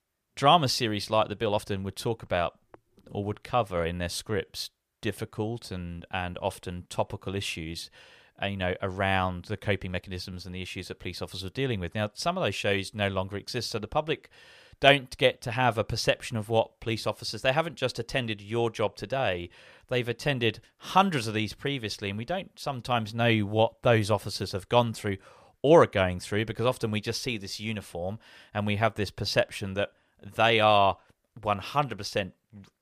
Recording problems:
uneven, jittery; slightly; from 1.5 to 10 s

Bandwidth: 15 kHz